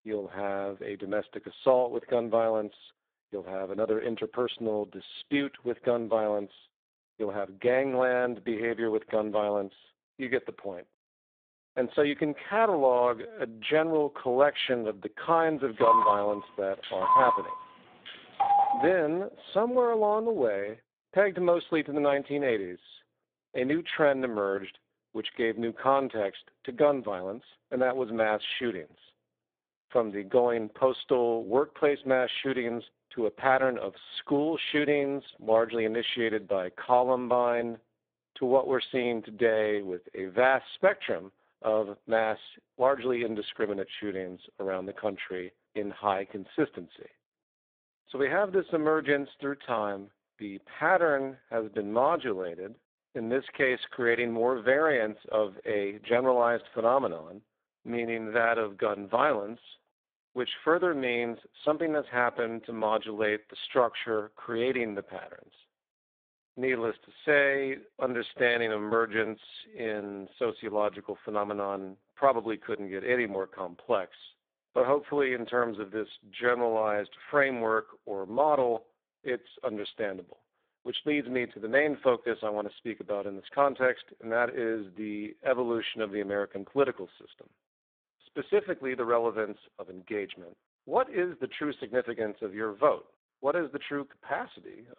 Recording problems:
phone-call audio; poor line; nothing above 3.5 kHz
phone ringing; loud; from 16 to 19 s; peak 6 dB above the speech

